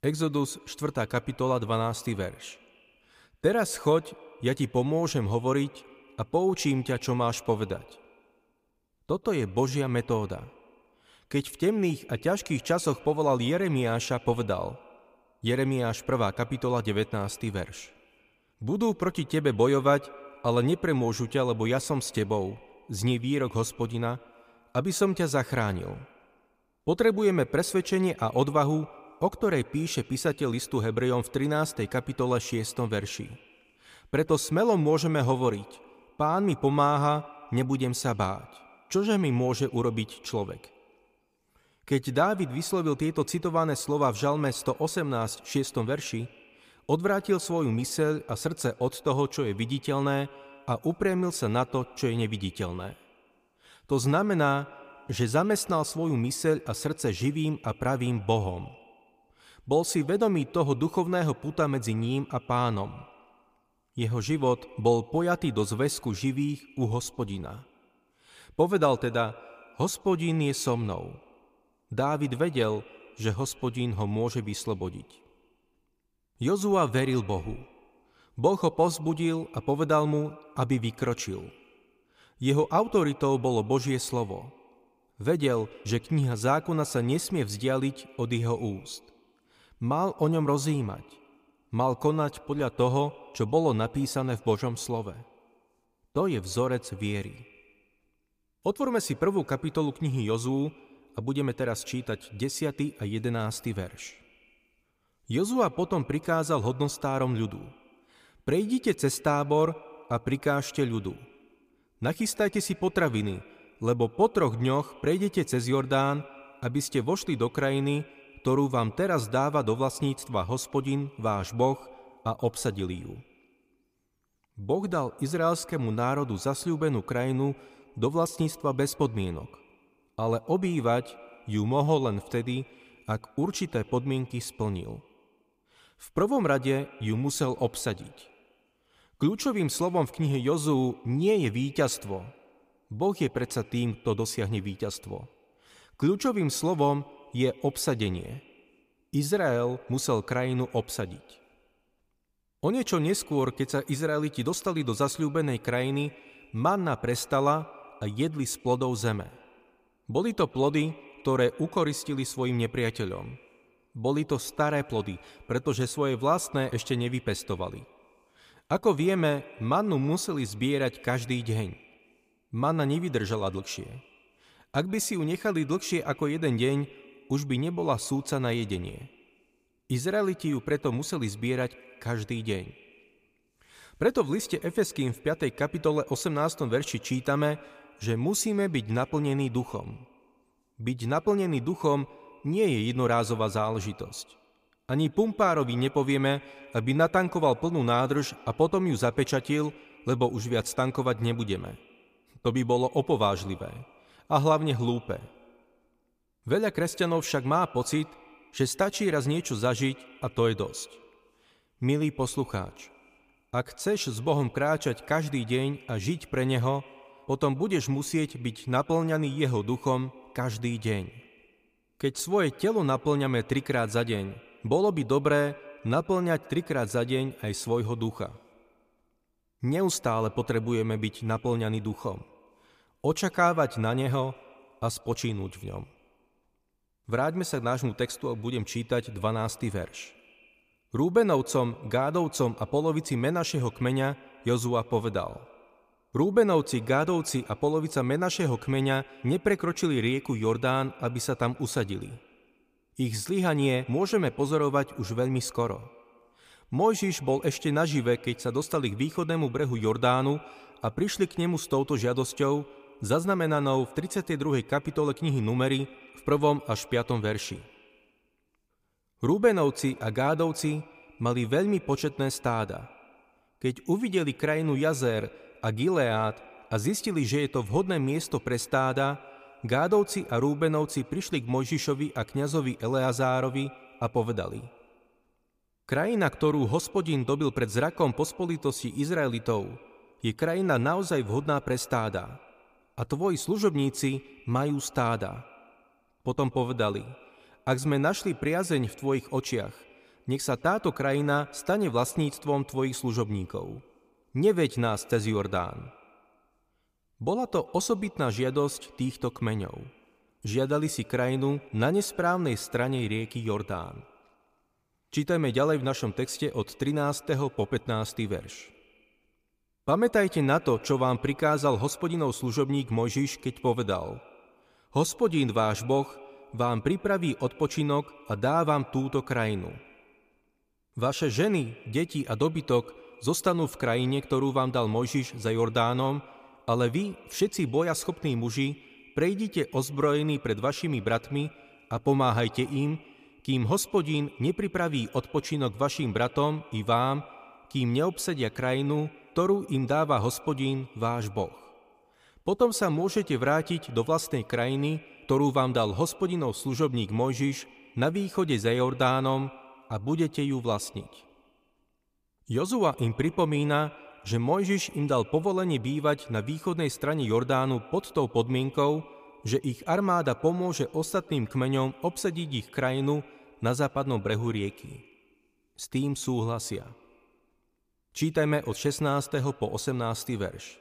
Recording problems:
echo of what is said; faint; throughout; 130 ms later, 25 dB below the speech

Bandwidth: 15 kHz